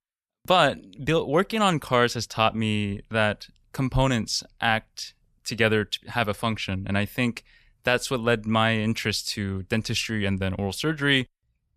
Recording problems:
none

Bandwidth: 14.5 kHz